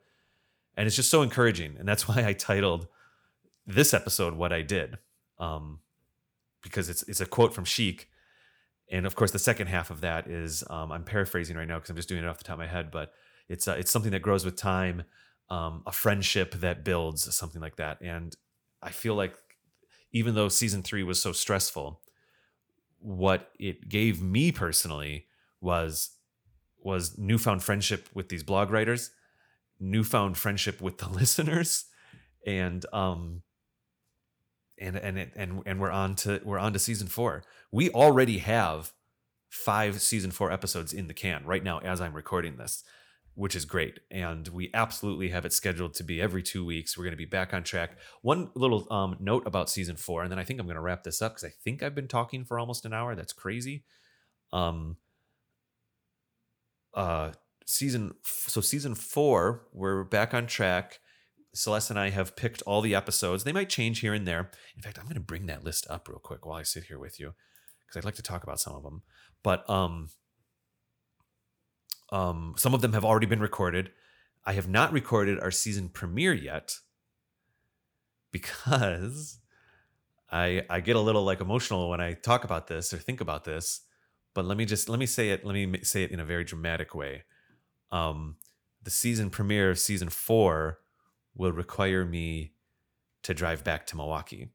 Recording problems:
none

